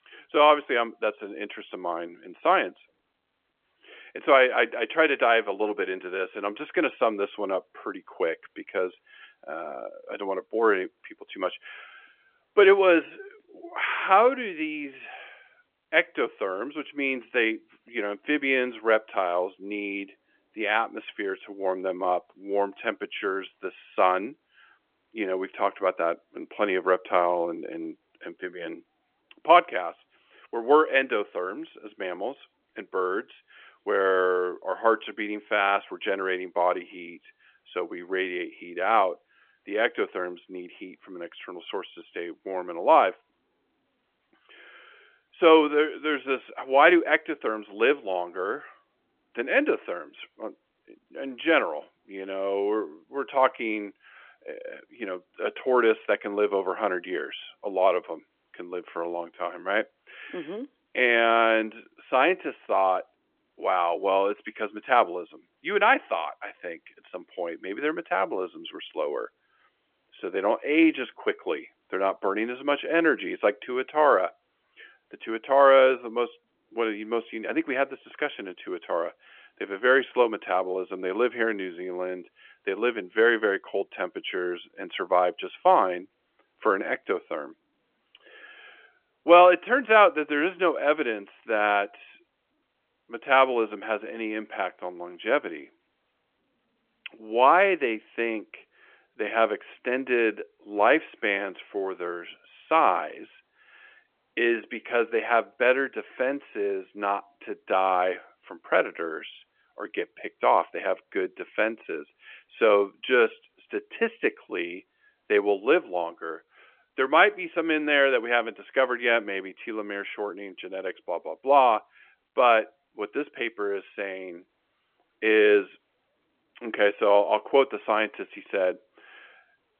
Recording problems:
phone-call audio; nothing above 3.5 kHz

